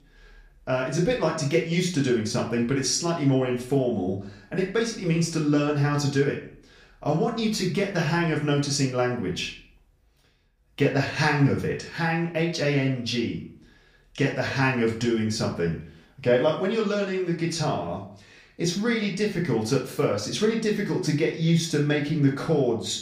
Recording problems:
off-mic speech; far
room echo; slight; dies away in 0.4 s

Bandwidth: 15 kHz